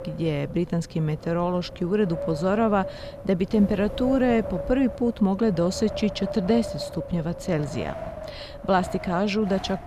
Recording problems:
wind noise on the microphone; heavy; 8 dB below the speech

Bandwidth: 15 kHz